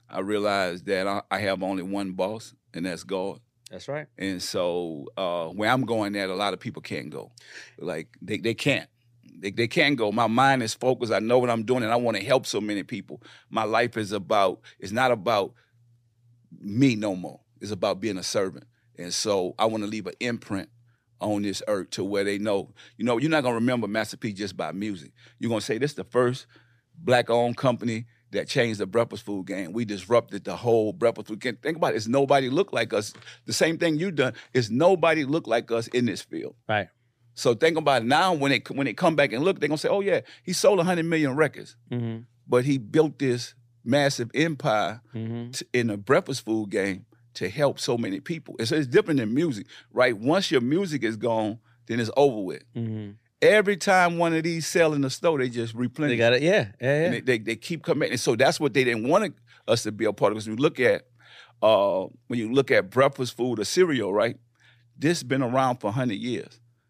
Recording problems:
none

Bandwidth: 15 kHz